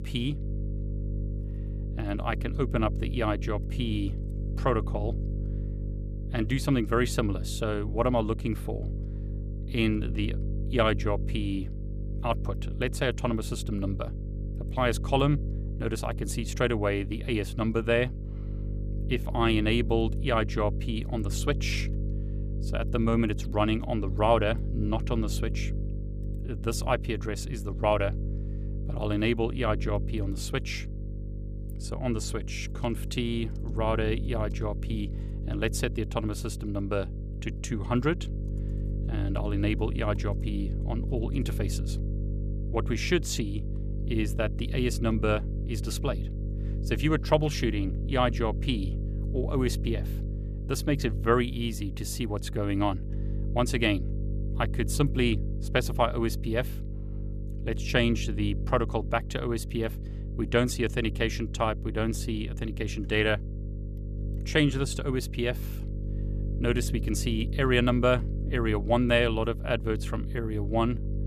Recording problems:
electrical hum; noticeable; throughout; 50 Hz, 15 dB below the speech

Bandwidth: 14.5 kHz